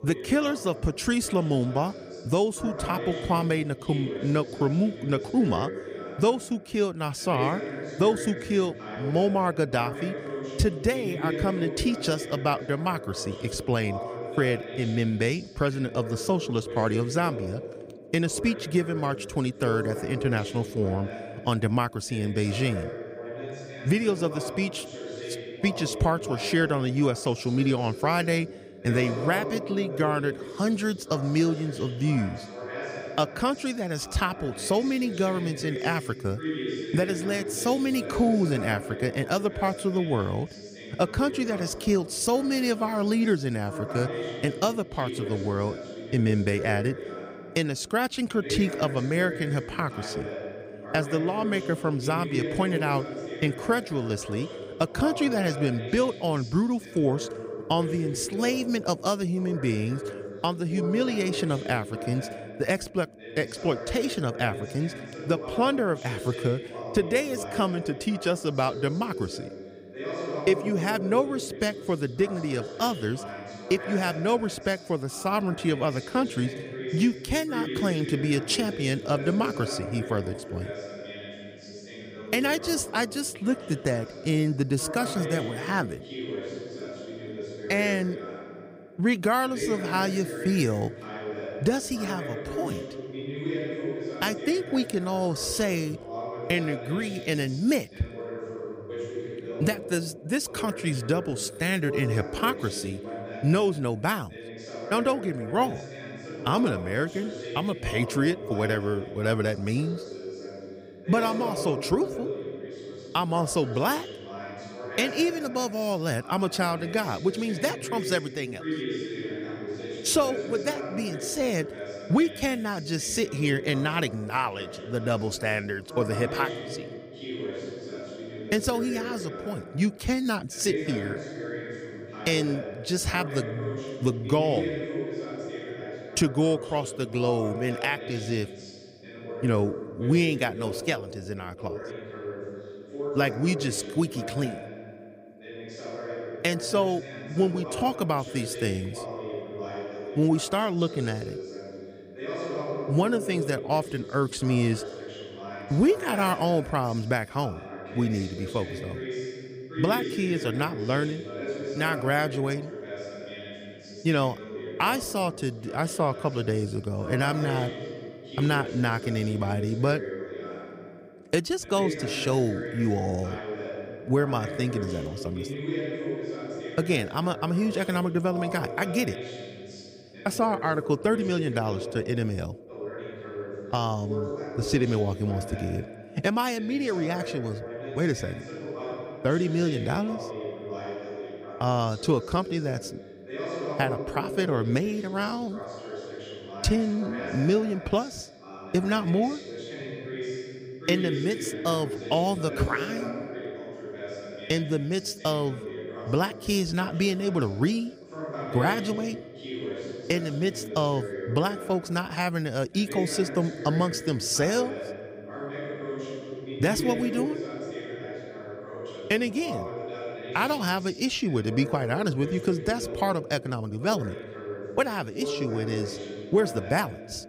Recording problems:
voice in the background; loud; throughout; 9 dB below the speech

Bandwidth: 15.5 kHz